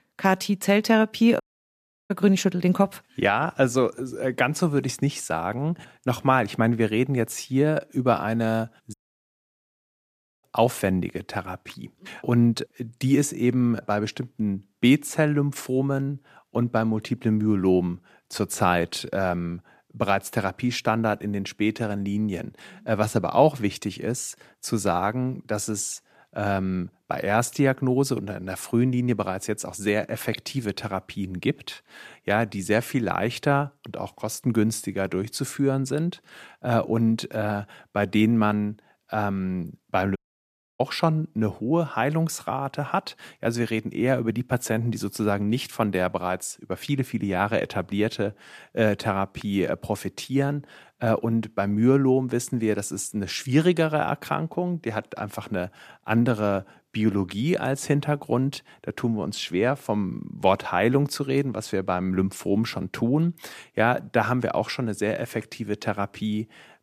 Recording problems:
audio cutting out; at 1.5 s for 0.5 s, at 9 s for 1.5 s and at 40 s for 0.5 s

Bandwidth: 14.5 kHz